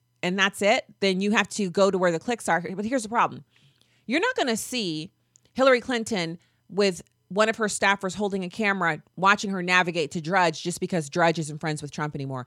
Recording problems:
none

